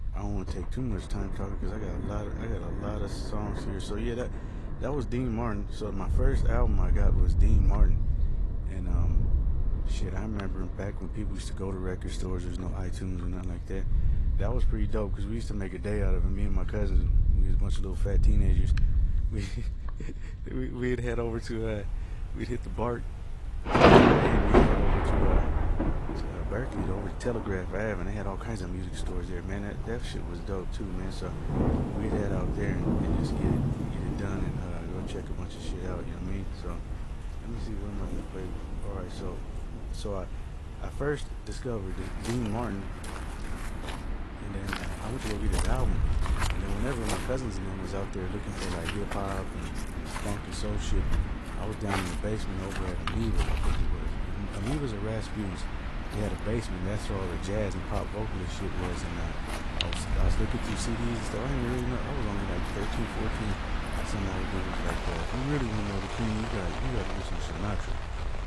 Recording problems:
garbled, watery; slightly
rain or running water; very loud; throughout; 3 dB above the speech
wind noise on the microphone; occasional gusts; 15 dB below the speech

